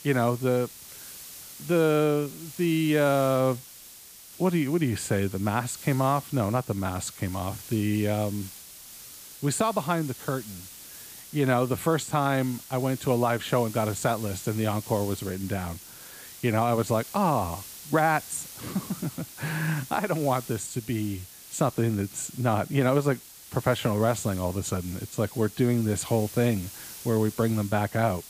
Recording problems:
hiss; noticeable; throughout; 15 dB below the speech

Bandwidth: 15 kHz